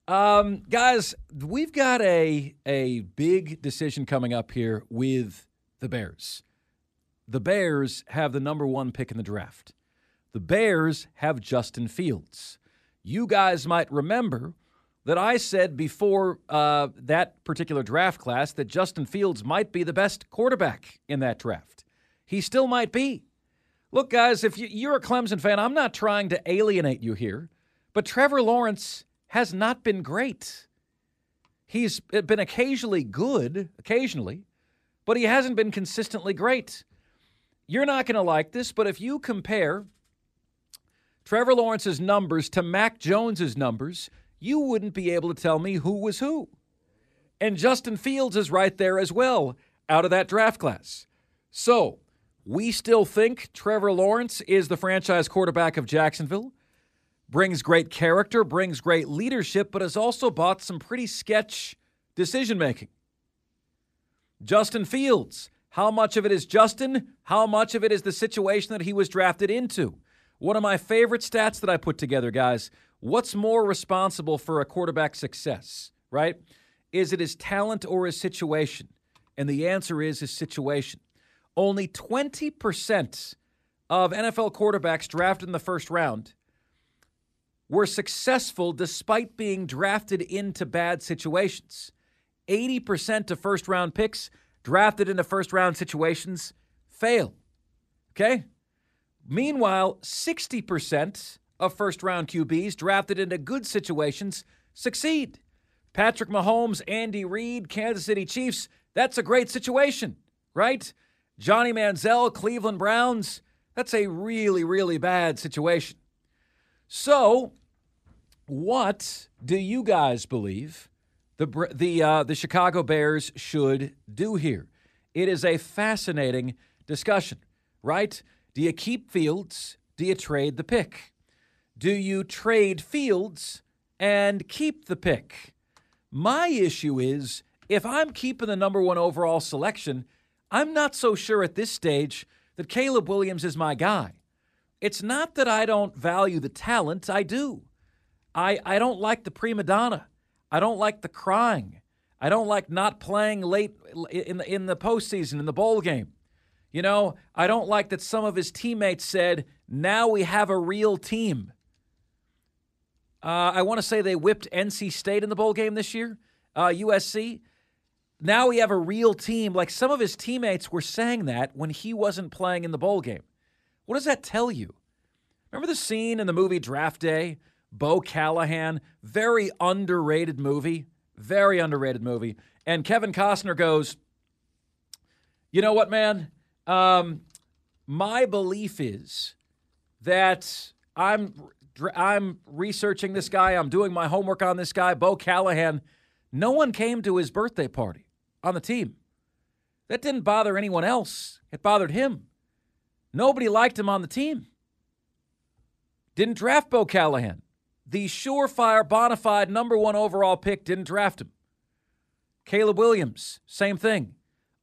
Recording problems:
none

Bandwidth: 14.5 kHz